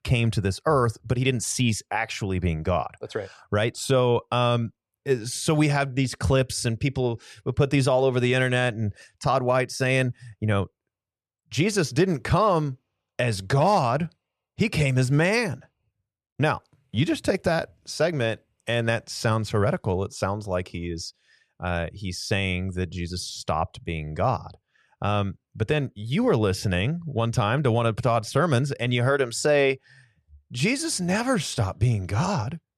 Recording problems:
none

